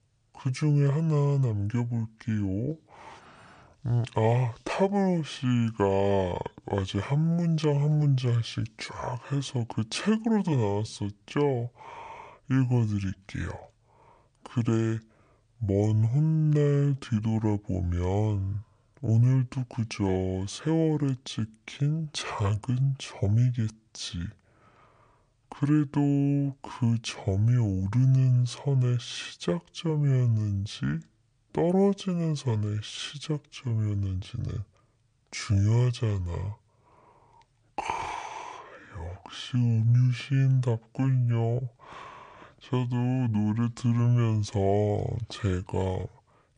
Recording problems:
wrong speed and pitch; too slow and too low; 0.6 times normal speed

